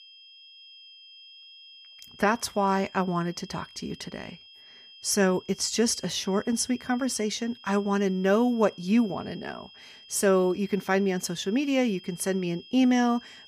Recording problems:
high-pitched whine; faint; throughout; 3 kHz, 20 dB below the speech

